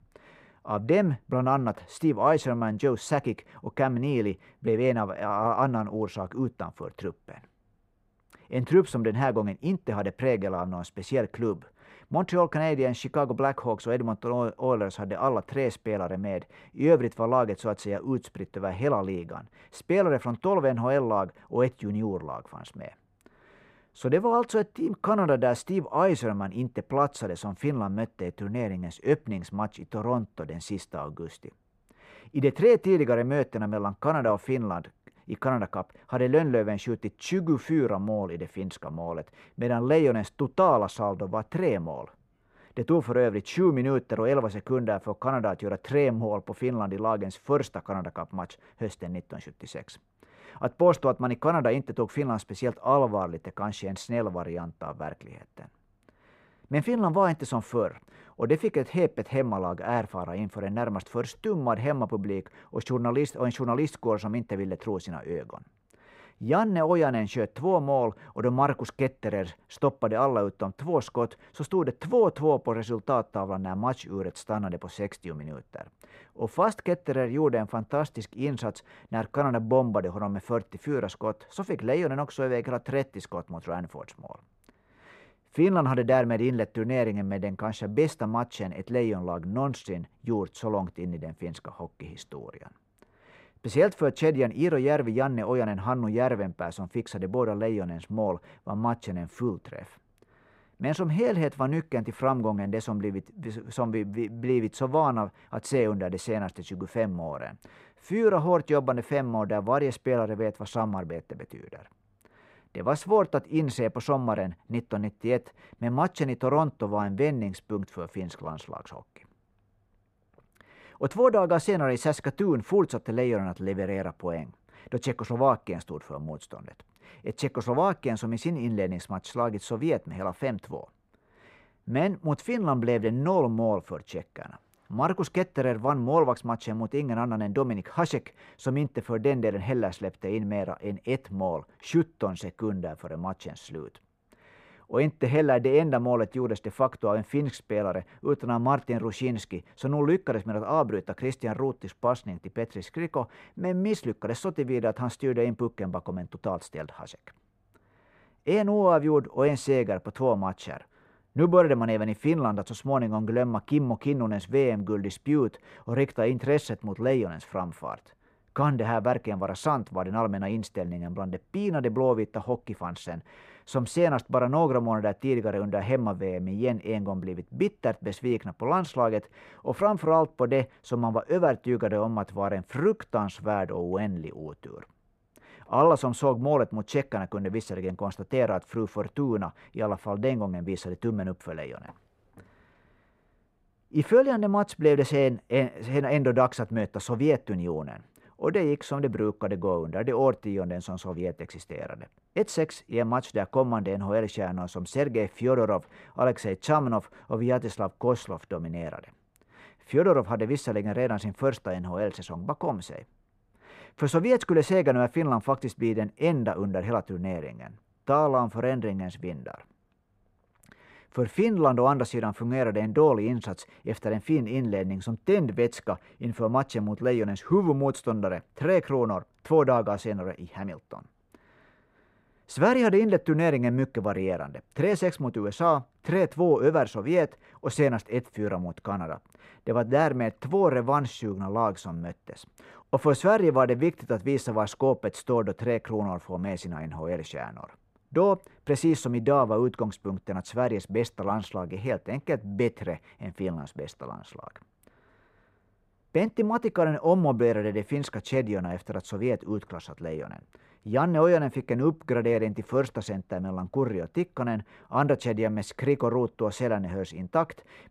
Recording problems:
muffled; slightly; fading above 3 kHz

